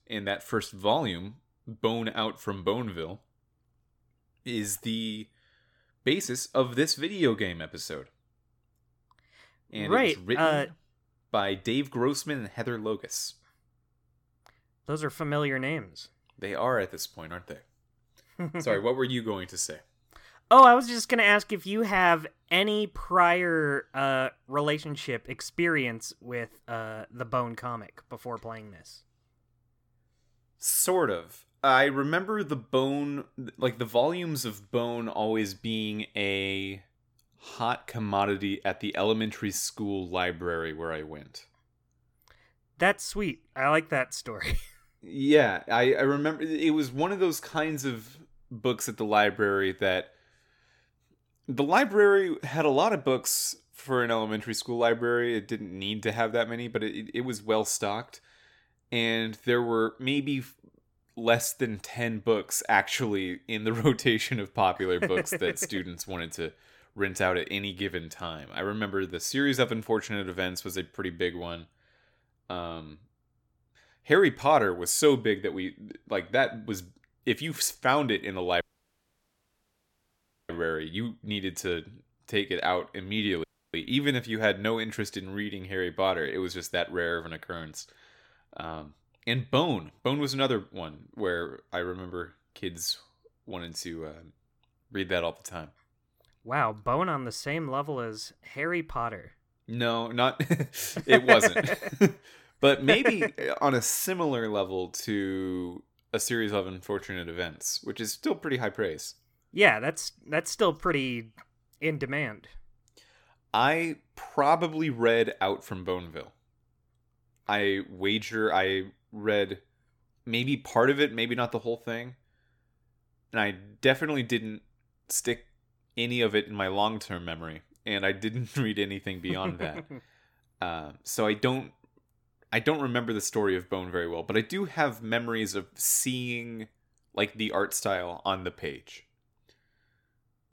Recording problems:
audio cutting out; at 1:19 for 2 s and at 1:23

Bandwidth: 17 kHz